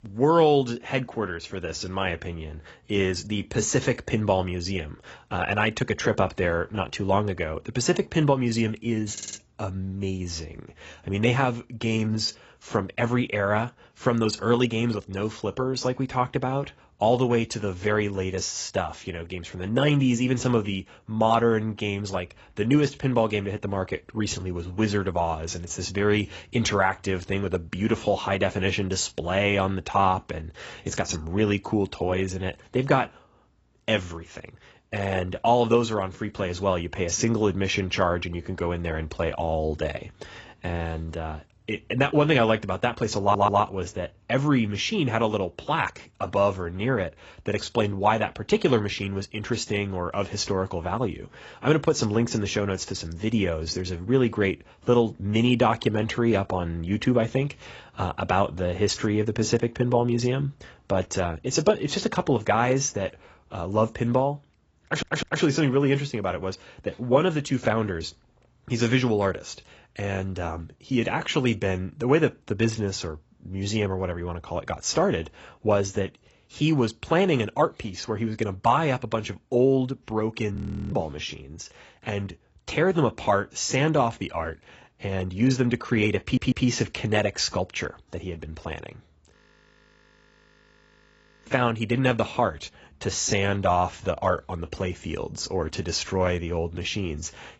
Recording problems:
garbled, watery; badly; nothing above 7.5 kHz
audio stuttering; 4 times, first at 9 s
audio freezing; at 1:21 and at 1:29 for 2 s

